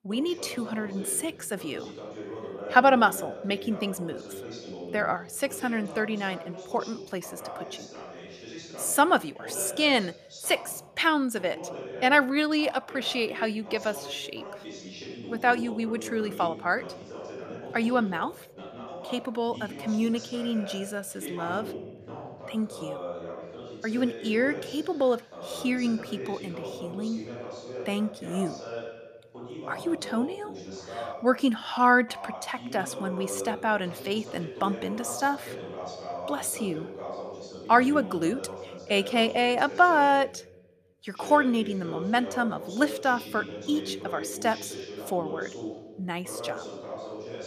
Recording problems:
voice in the background; noticeable; throughout; 10 dB below the speech

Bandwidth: 14.5 kHz